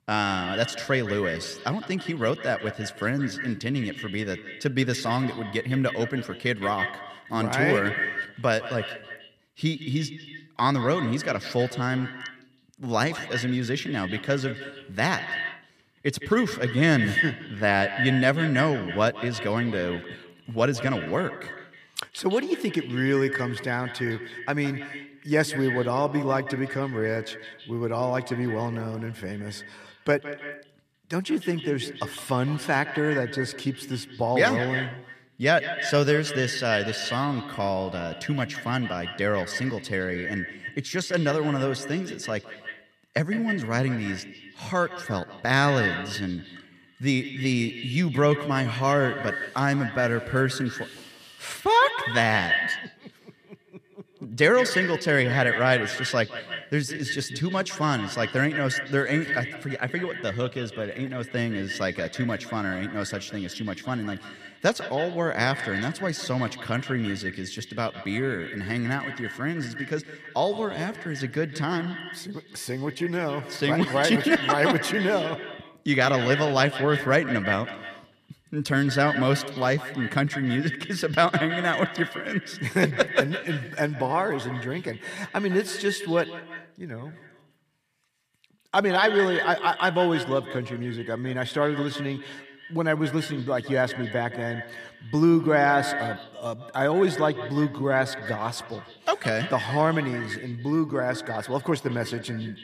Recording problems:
echo of what is said; strong; throughout; 160 ms later, 8 dB below the speech

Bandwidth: 14.5 kHz